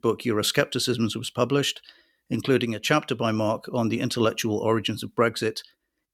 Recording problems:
none

